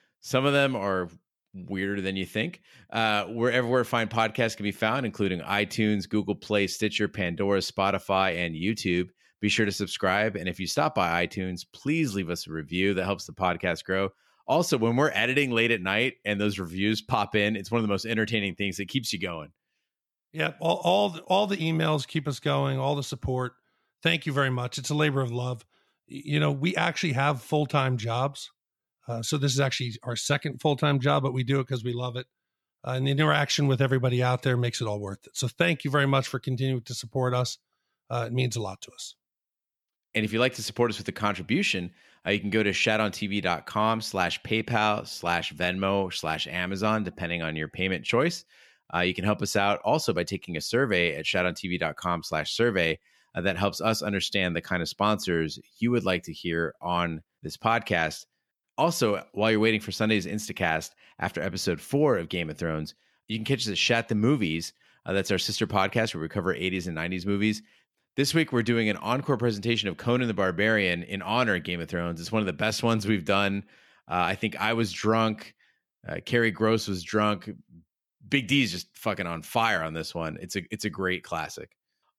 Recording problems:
none

